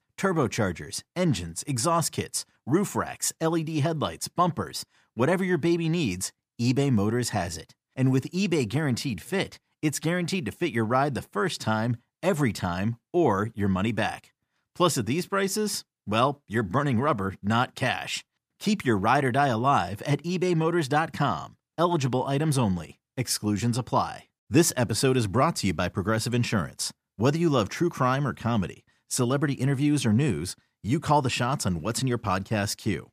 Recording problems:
none

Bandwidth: 15 kHz